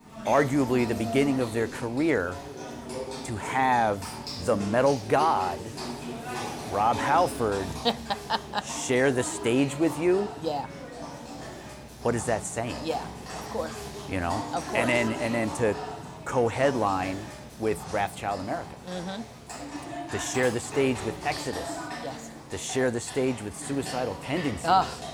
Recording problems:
animal sounds; loud; throughout; 10 dB below the speech

